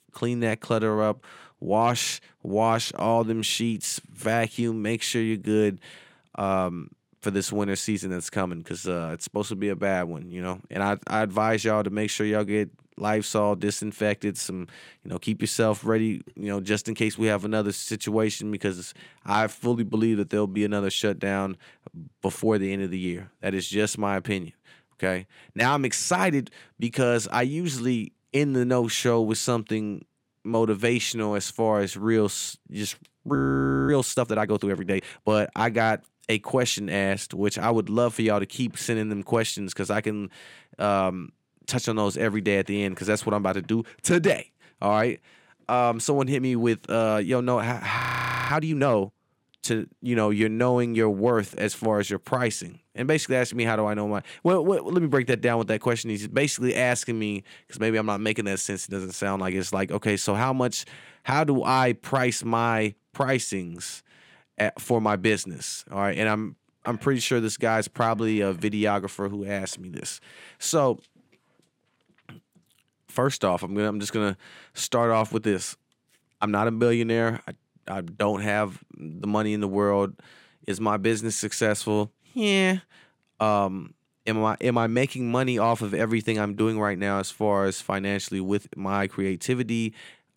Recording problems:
audio freezing; at 33 s for 0.5 s and at 48 s for 0.5 s

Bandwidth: 16.5 kHz